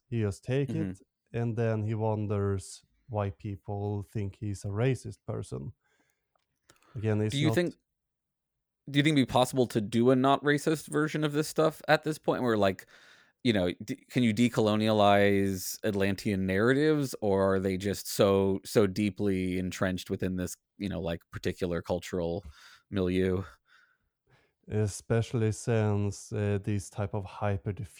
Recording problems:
none

